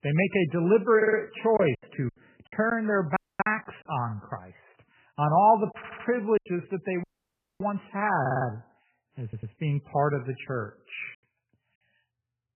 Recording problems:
garbled, watery; badly; nothing above 3 kHz
choppy; occasionally; 5% of the speech affected
audio stuttering; 4 times, first at 1 s
audio cutting out; at 3 s and at 7 s for 0.5 s

